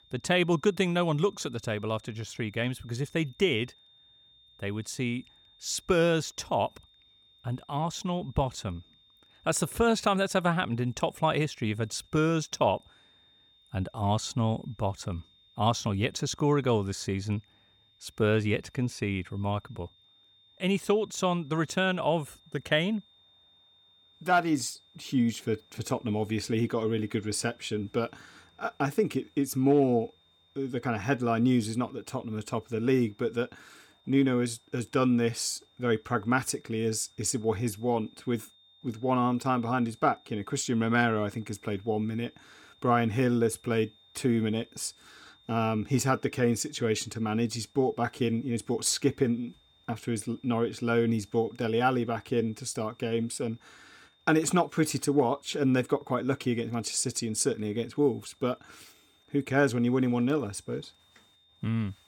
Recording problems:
high-pitched whine; faint; throughout; 3.5 kHz, 30 dB below the speech

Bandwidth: 18 kHz